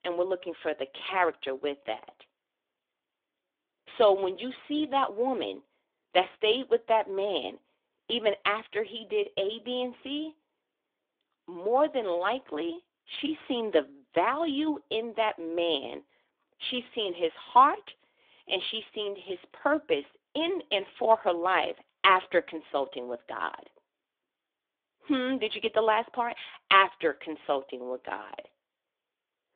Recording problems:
phone-call audio; nothing above 3.5 kHz

